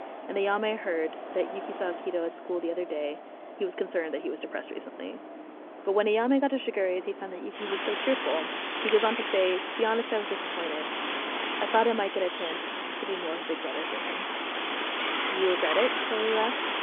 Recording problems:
phone-call audio
wind in the background; loud; throughout; 2 dB below the speech

